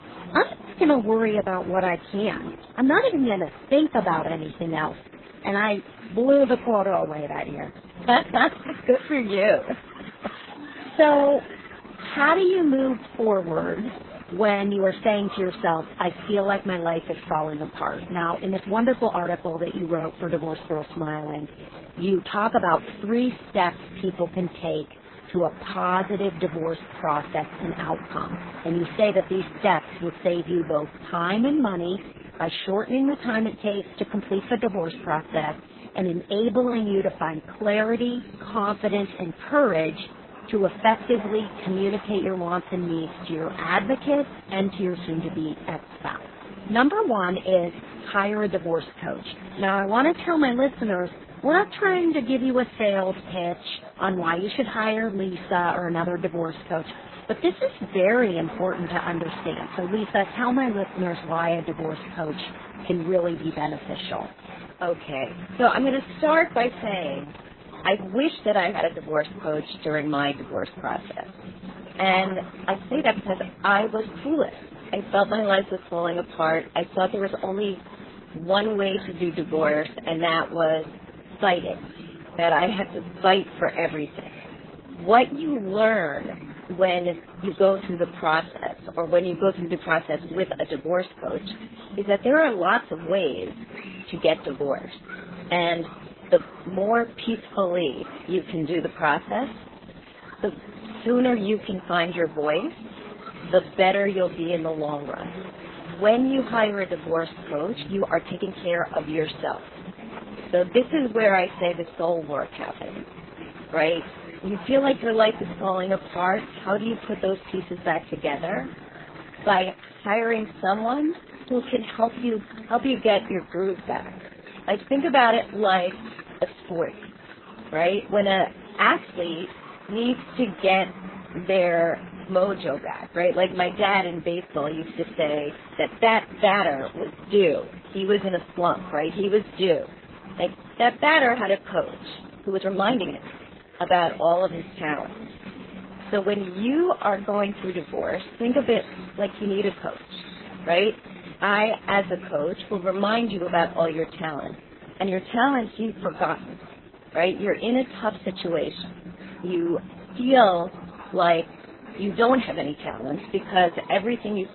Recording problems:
garbled, watery; badly; nothing above 4 kHz
murmuring crowd; noticeable; throughout; 15 dB below the speech
uneven, jittery; strongly; from 2 s to 2:23

